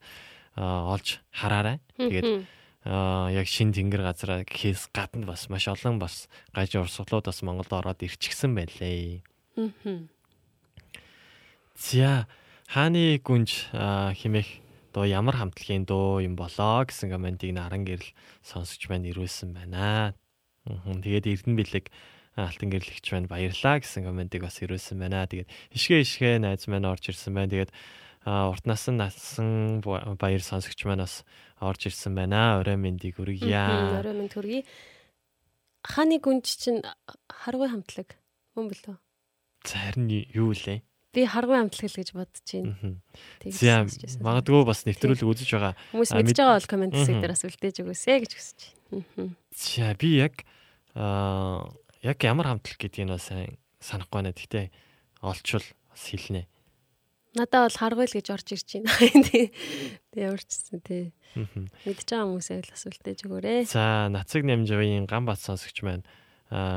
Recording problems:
abrupt cut into speech; at the end

